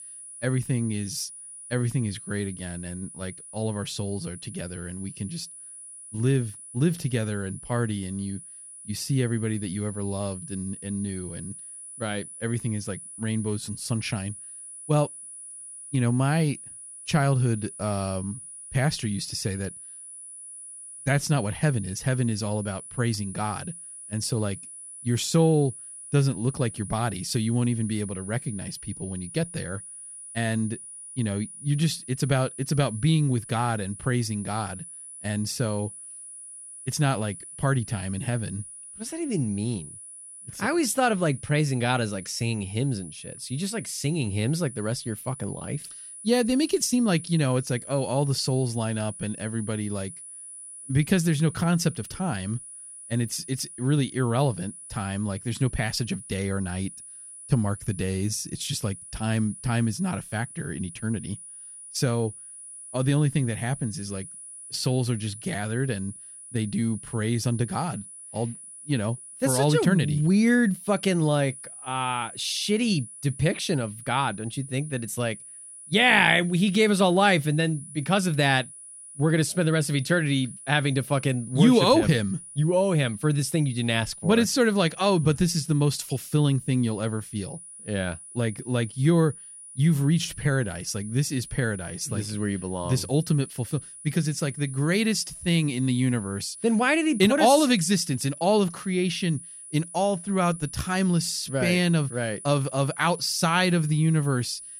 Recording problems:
high-pitched whine; noticeable; throughout; 10 kHz, 15 dB below the speech

